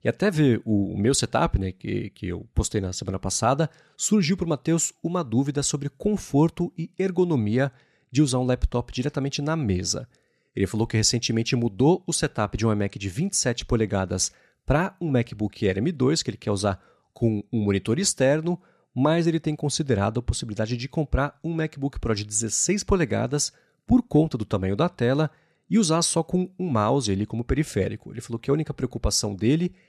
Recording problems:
none

